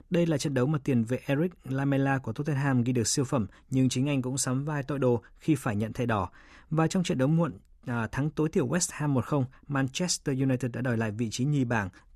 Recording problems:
none

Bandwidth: 13.5 kHz